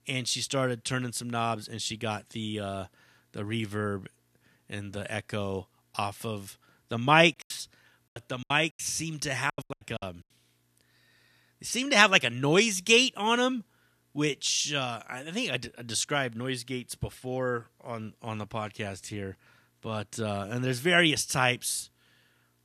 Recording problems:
choppy; very; from 7.5 to 10 s; 20% of the speech affected

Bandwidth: 14 kHz